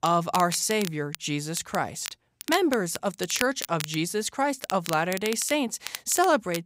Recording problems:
crackle, like an old record; noticeable; 10 dB below the speech

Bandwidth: 15.5 kHz